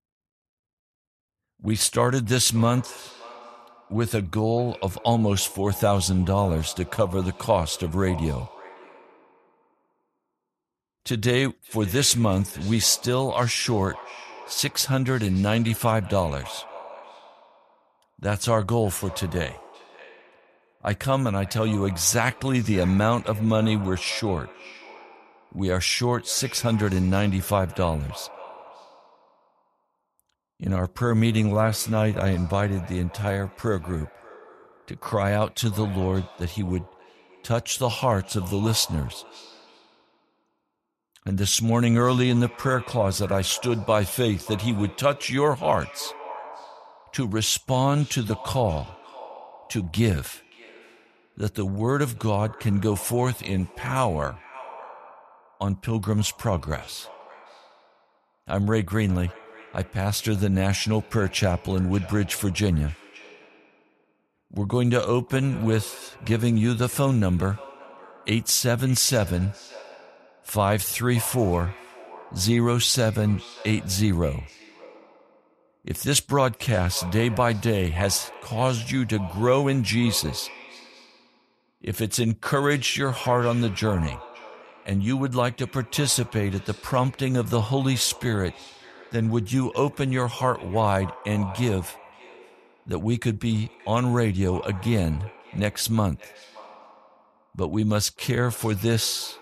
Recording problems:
echo of what is said; faint; throughout; 580 ms later, 20 dB below the speech

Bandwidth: 13.5 kHz